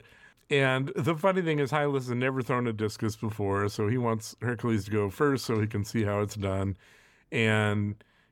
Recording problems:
none

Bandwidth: 17.5 kHz